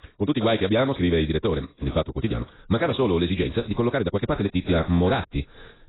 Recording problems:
garbled, watery; badly; nothing above 4 kHz
wrong speed, natural pitch; too fast; 1.8 times normal speed

